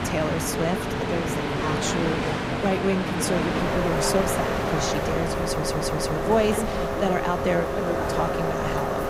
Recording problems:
train or aircraft noise; very loud; throughout; 2 dB above the speech
audio stuttering; at 5.5 s

